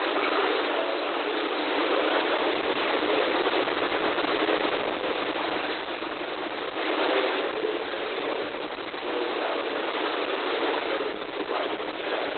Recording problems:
off-mic speech; far
garbled, watery; badly; nothing above 4 kHz
room echo; noticeable; dies away in 1.4 s
thin; somewhat; fading below 300 Hz
wind noise on the microphone; heavy; 5 dB above the speech

